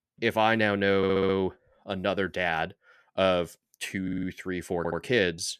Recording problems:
audio stuttering; at 1 s, at 4 s and at 5 s

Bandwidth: 14.5 kHz